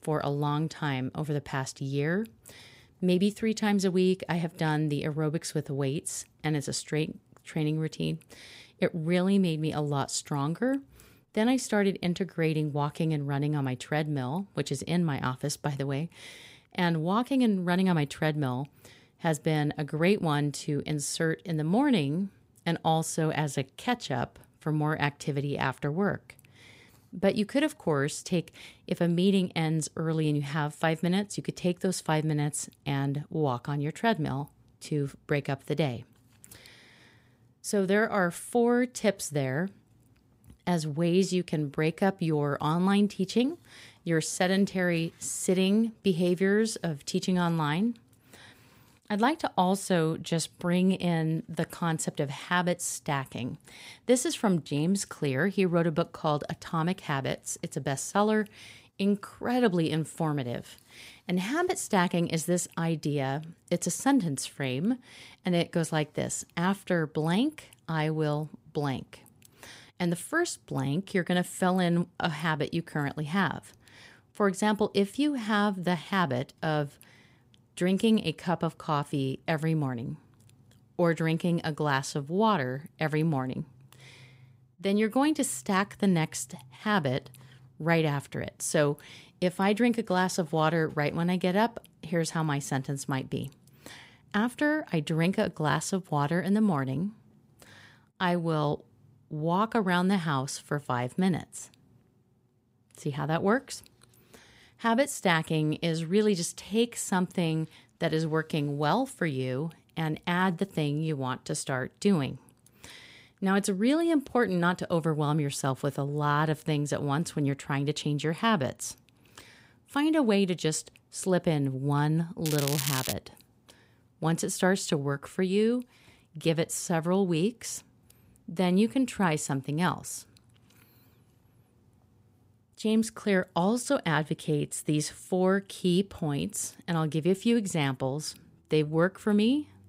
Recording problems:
crackling; loud; at 2:02; 4 dB below the speech

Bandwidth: 15.5 kHz